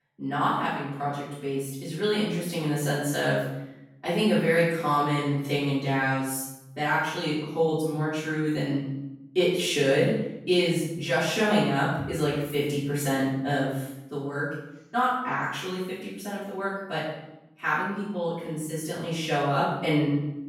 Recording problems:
off-mic speech; far
room echo; noticeable; dies away in 0.8 s

